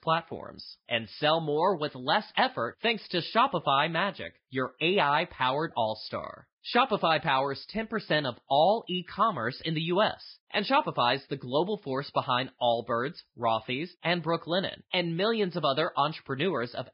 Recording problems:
garbled, watery; badly; nothing above 5 kHz
high frequencies cut off; slight

